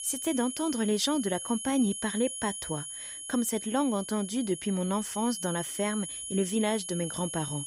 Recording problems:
high-pitched whine; loud; throughout; 10.5 kHz, 6 dB below the speech

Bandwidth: 15.5 kHz